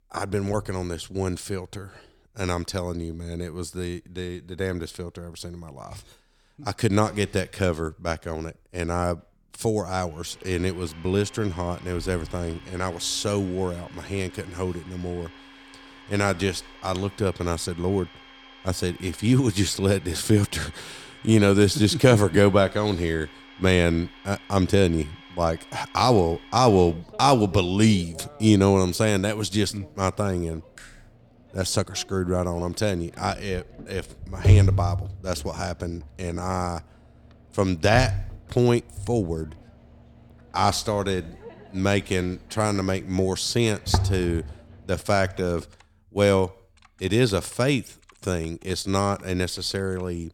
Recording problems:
household noises; faint; from 10 s on; 25 dB below the speech

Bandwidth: 18 kHz